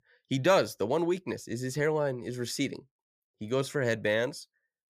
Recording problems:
none

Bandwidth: 15 kHz